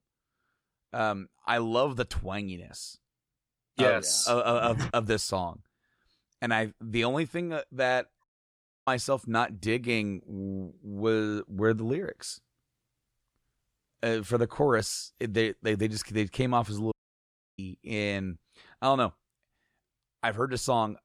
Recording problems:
audio cutting out; at 8 s for 0.5 s and at 17 s for 0.5 s

